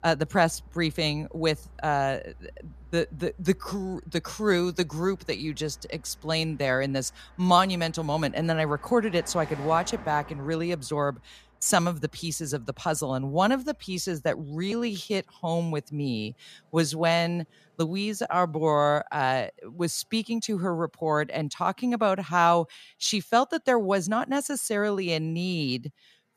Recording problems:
traffic noise; faint; throughout; 25 dB below the speech

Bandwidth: 14.5 kHz